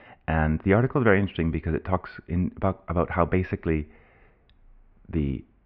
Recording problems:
muffled; very; fading above 2 kHz

